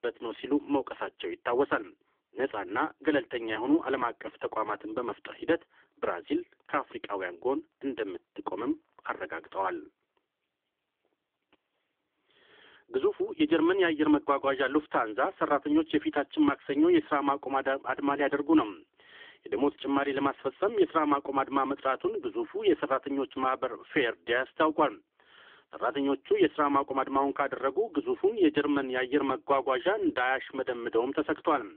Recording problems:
phone-call audio; poor line; nothing above 3.5 kHz

